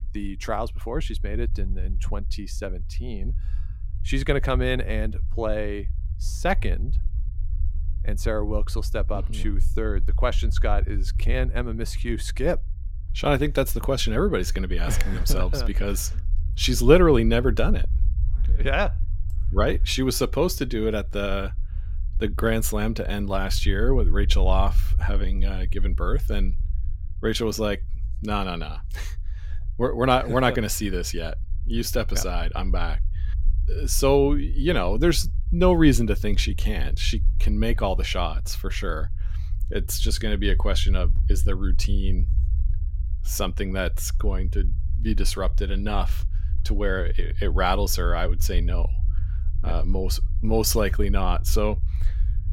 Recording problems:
low rumble; faint; throughout; 20 dB below the speech

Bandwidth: 16.5 kHz